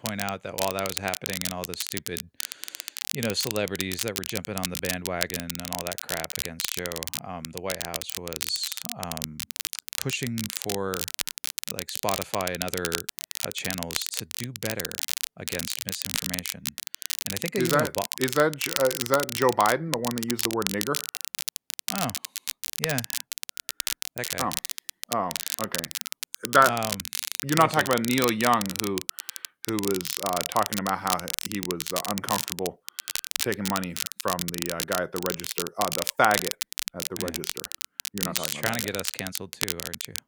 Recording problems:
crackle, like an old record; loud; 2 dB below the speech

